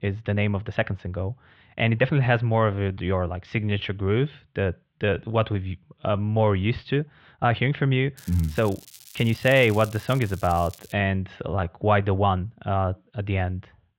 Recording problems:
muffled; very; fading above 3.5 kHz
crackling; faint; from 8 to 11 s; 20 dB below the speech
uneven, jittery; strongly; from 0.5 to 13 s

